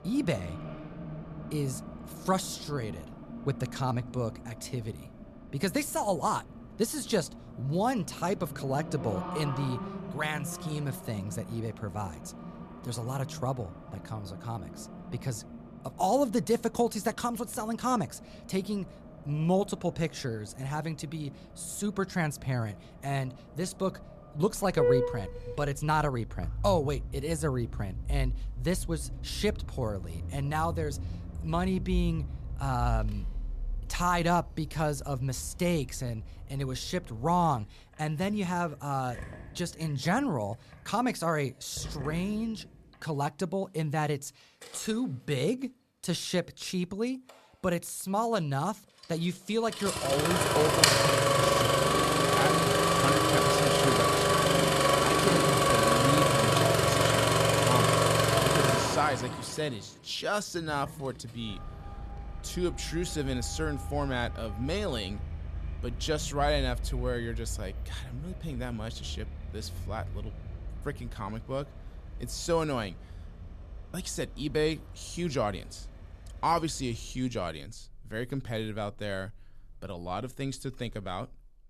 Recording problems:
traffic noise; very loud; throughout; 4 dB above the speech

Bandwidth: 14 kHz